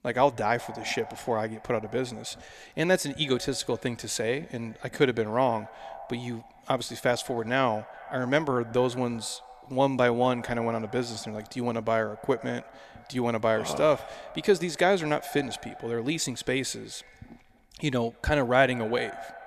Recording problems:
echo of what is said; faint; throughout; 190 ms later, 20 dB below the speech

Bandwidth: 14.5 kHz